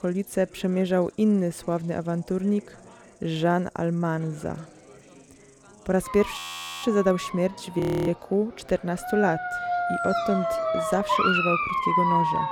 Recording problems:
animal sounds; loud; throughout; as loud as the speech
chatter from many people; faint; throughout; 25 dB below the speech
audio freezing; at 6.5 s and at 8 s

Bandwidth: 18 kHz